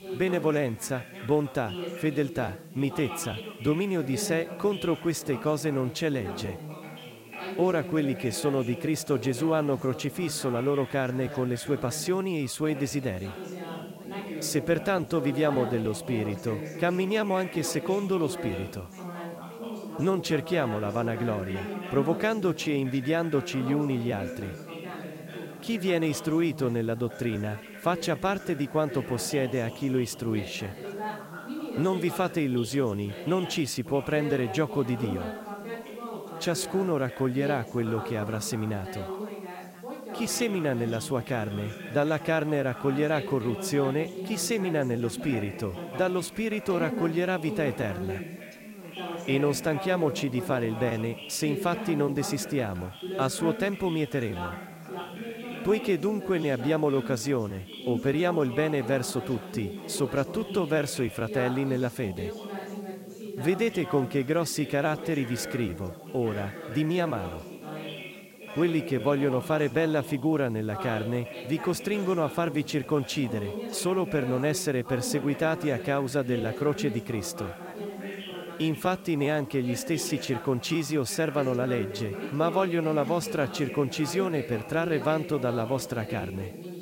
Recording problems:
background chatter; loud; throughout; 4 voices, 10 dB below the speech
hiss; faint; throughout; 30 dB below the speech

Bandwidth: 16 kHz